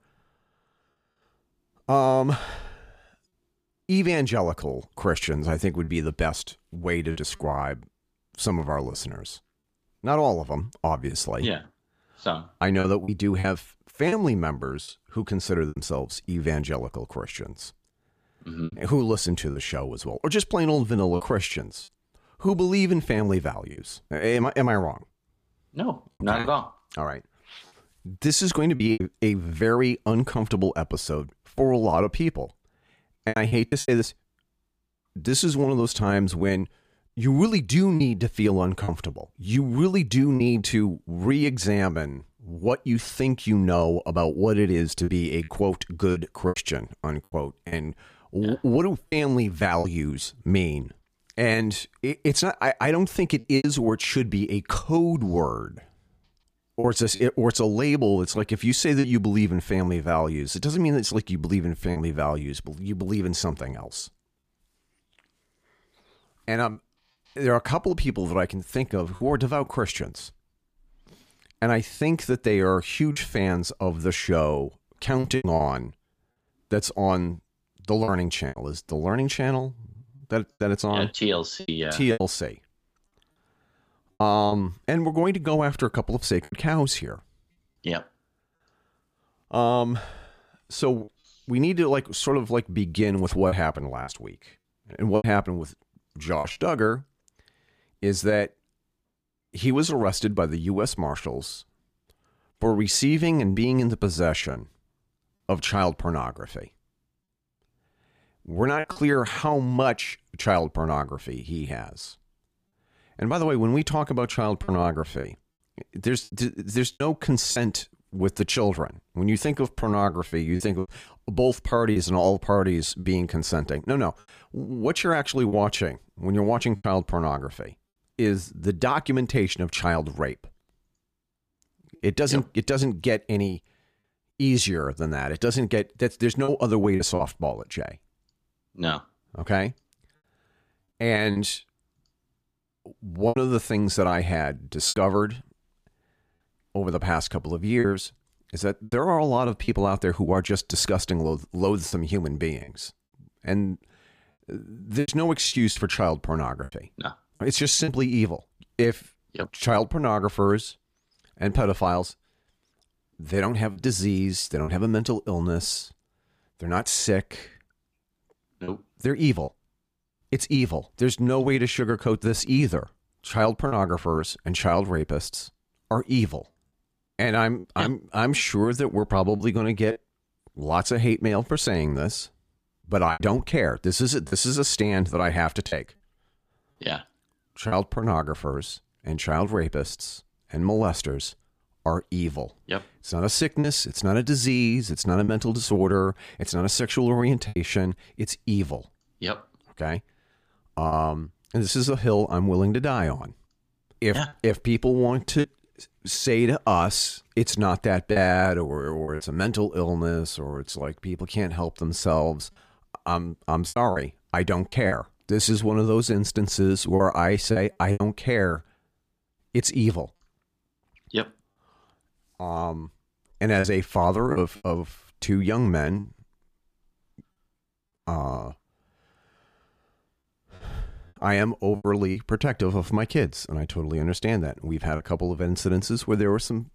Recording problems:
choppy; occasionally; 4% of the speech affected

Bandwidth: 15 kHz